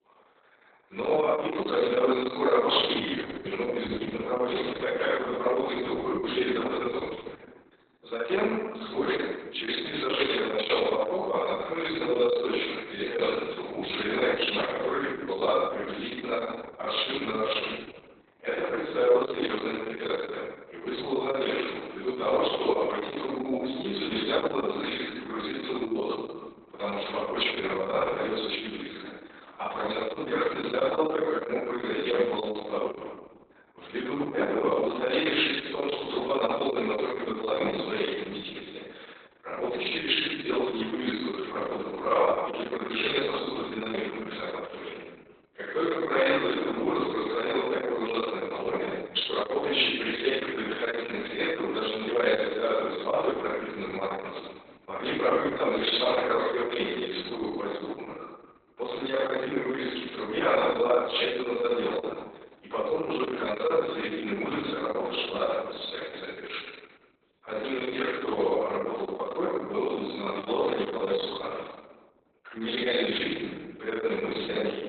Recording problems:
off-mic speech; far
garbled, watery; badly; nothing above 4 kHz
room echo; noticeable; dies away in 1.1 s
thin; somewhat; fading below 350 Hz

